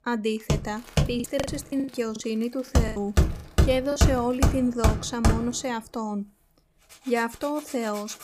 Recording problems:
machinery noise; very loud; throughout; 2 dB above the speech
household noises; faint; throughout; 25 dB below the speech
choppy; very; from 1 to 4 s; 19% of the speech affected

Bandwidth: 15 kHz